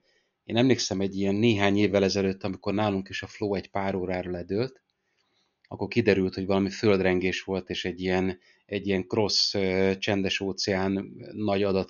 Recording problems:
high frequencies cut off; noticeable; nothing above 7 kHz

